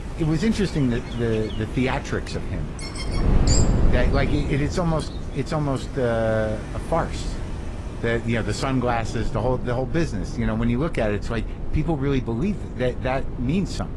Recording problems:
garbled, watery; slightly; nothing above 11 kHz
animal sounds; noticeable; until 5 s; 10 dB below the speech
rain or running water; noticeable; throughout; 20 dB below the speech
wind noise on the microphone; occasional gusts; 10 dB below the speech
electrical hum; faint; throughout; 50 Hz, 25 dB below the speech

